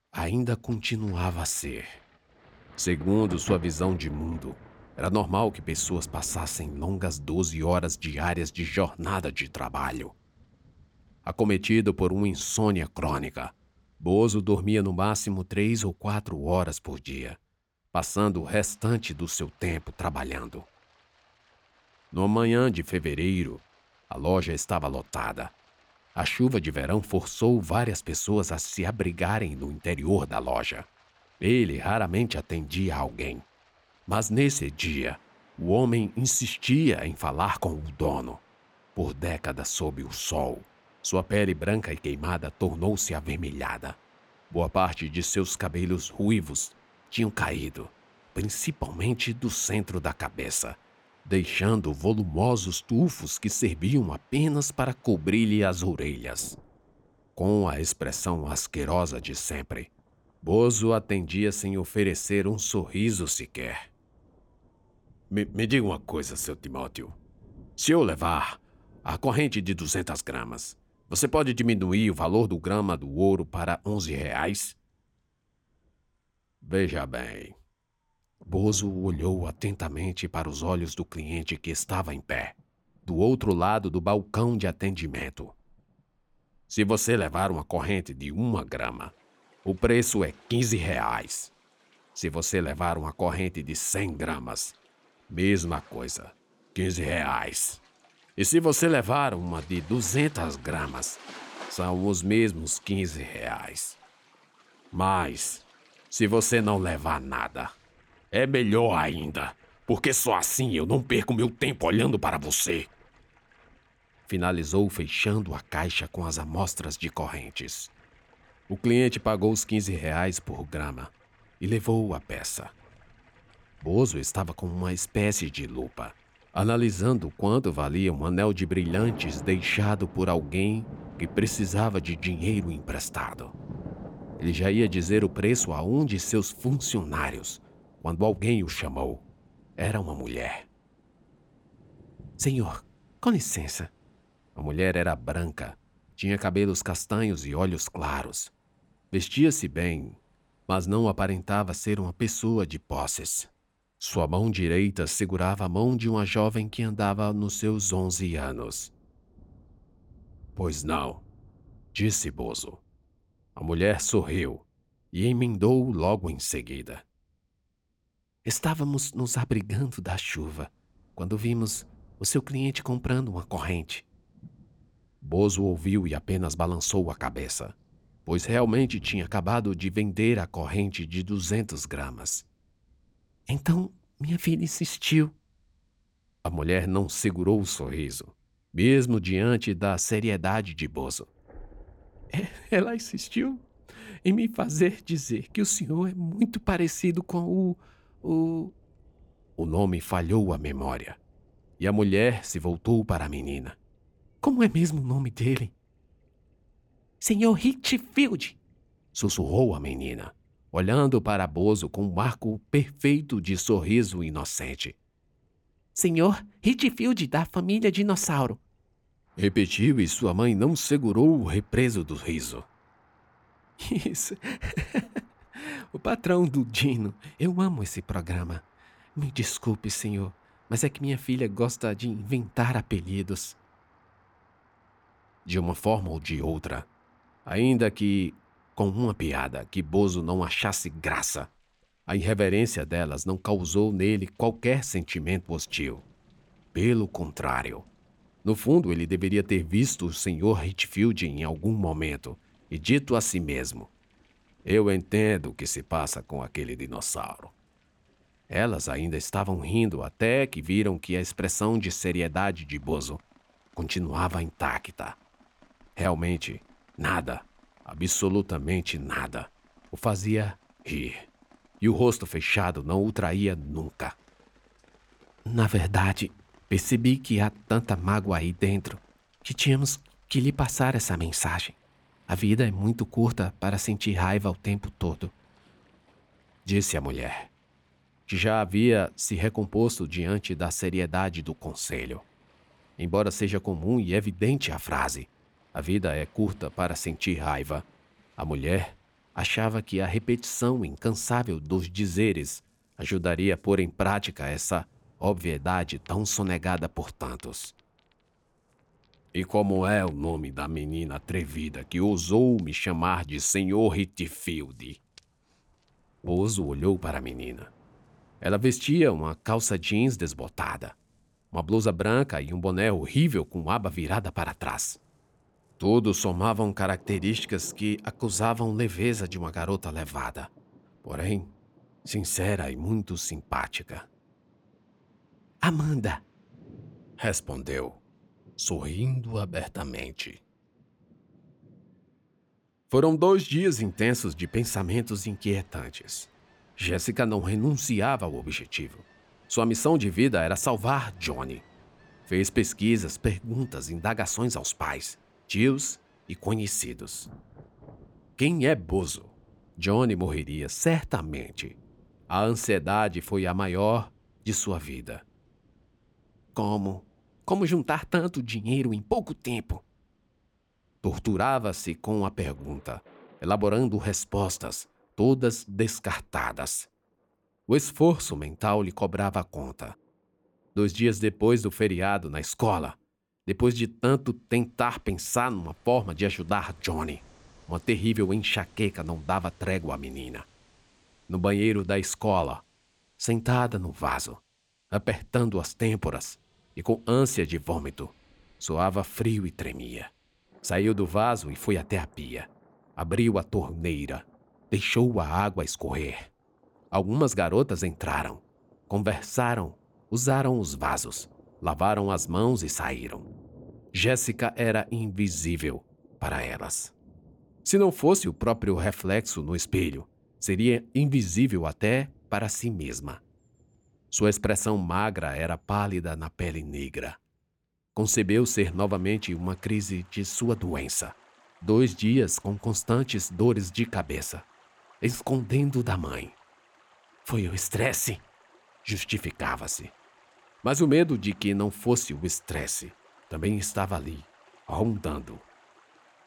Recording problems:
rain or running water; faint; throughout; 25 dB below the speech

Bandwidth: 18.5 kHz